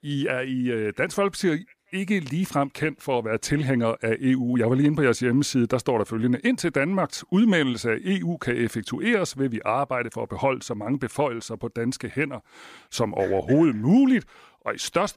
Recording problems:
none

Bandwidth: 15 kHz